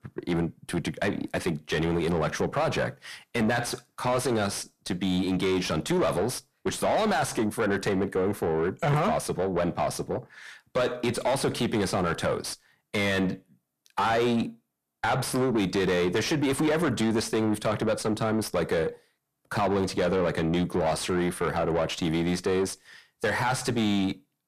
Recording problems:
distortion; heavy; 6 dB below the speech

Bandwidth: 14.5 kHz